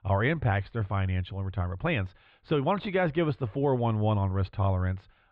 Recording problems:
muffled; very; fading above 3.5 kHz

